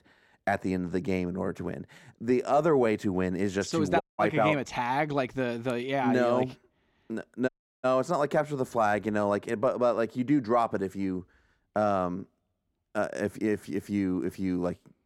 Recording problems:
audio cutting out; at 4 s and at 7.5 s

